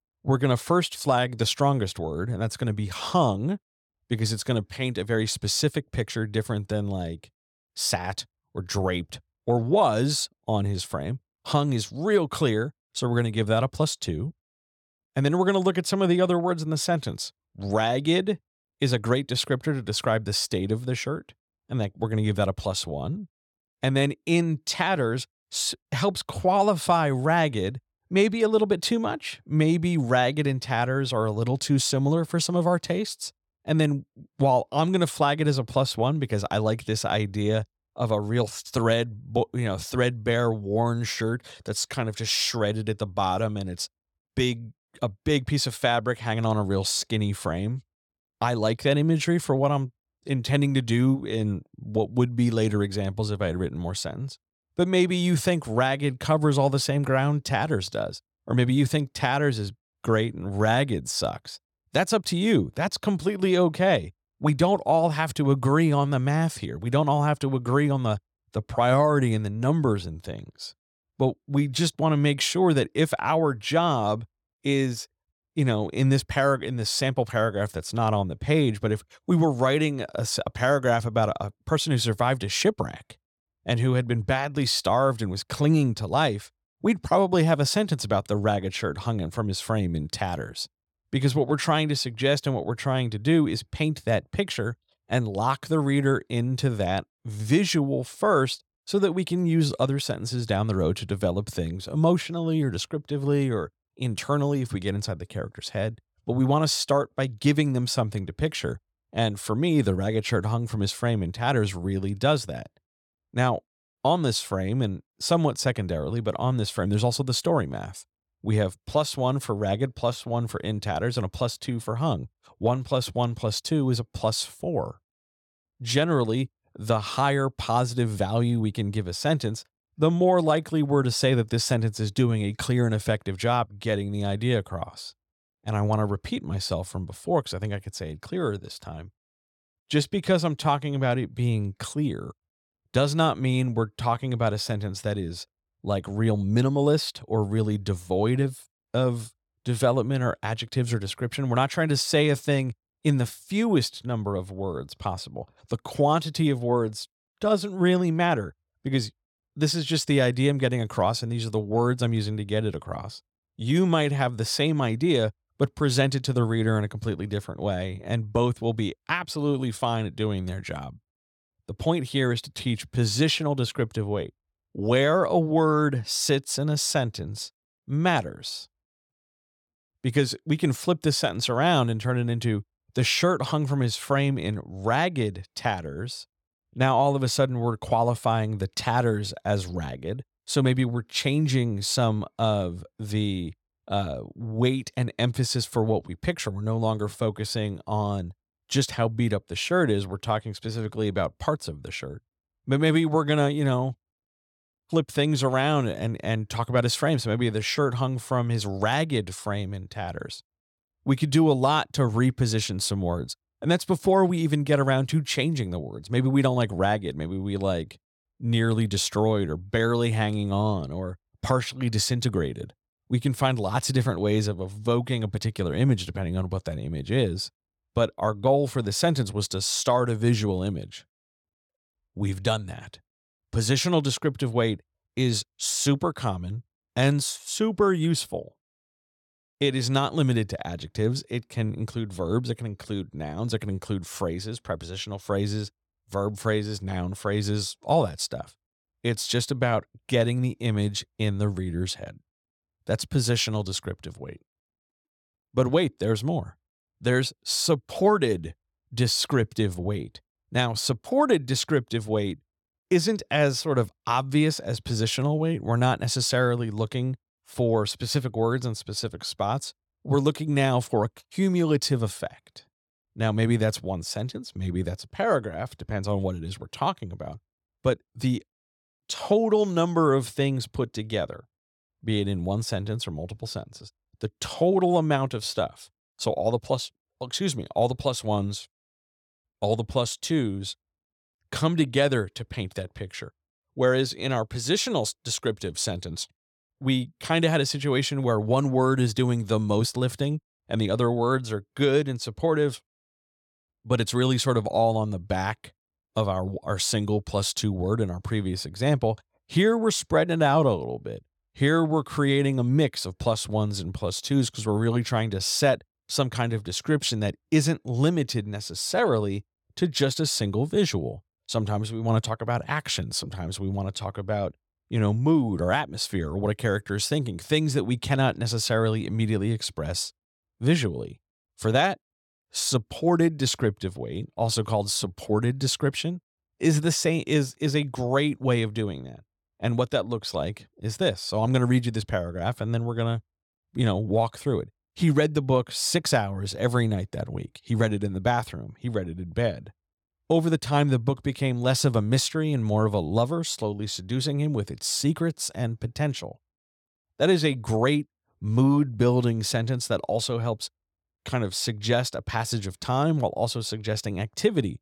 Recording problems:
none

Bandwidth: 18.5 kHz